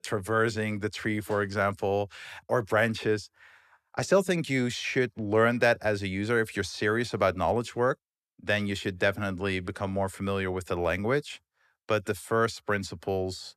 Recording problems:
none

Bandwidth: 14 kHz